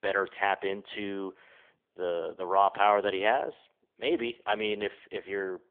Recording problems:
phone-call audio; poor line; nothing above 3.5 kHz

